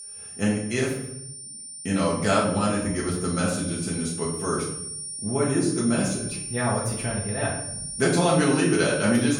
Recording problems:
off-mic speech; far
room echo; noticeable; dies away in 0.6 s
high-pitched whine; loud; throughout; 9 kHz, 8 dB below the speech

